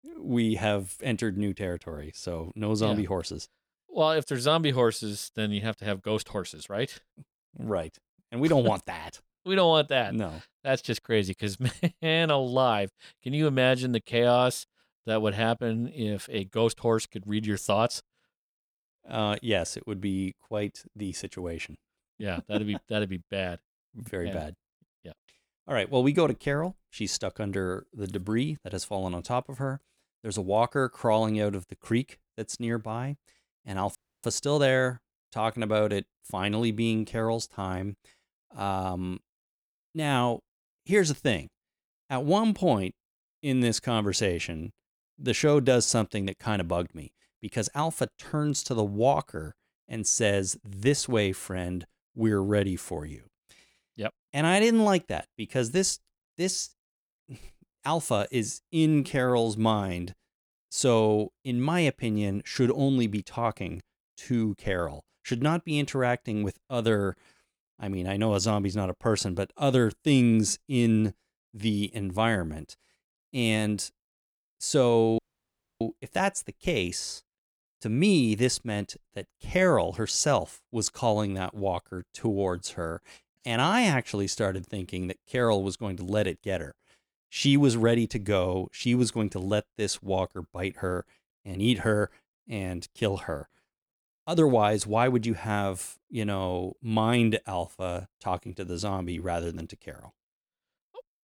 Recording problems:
audio cutting out; at 34 s and at 1:15 for 0.5 s

